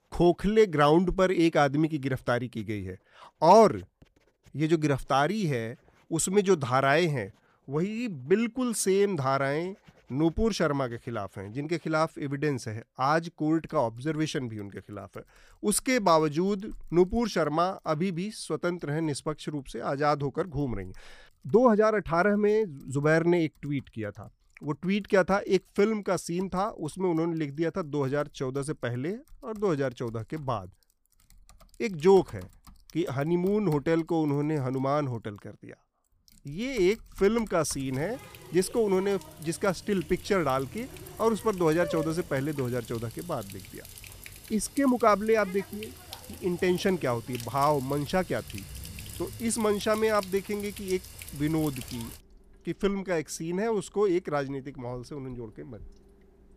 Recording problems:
household noises; noticeable; throughout; 15 dB below the speech

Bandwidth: 15 kHz